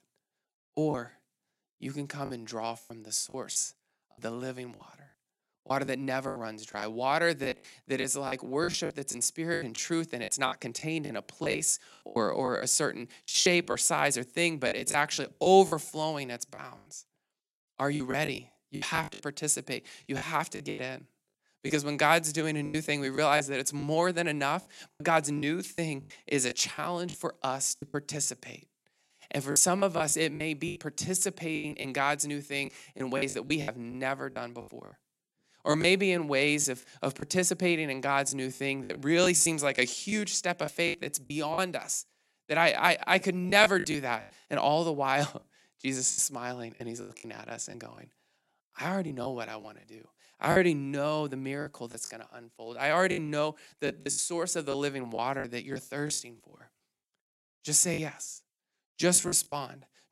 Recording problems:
choppy; very; 11% of the speech affected

